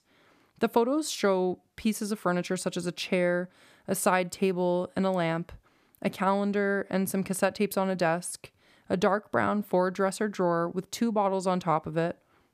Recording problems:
none

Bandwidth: 14.5 kHz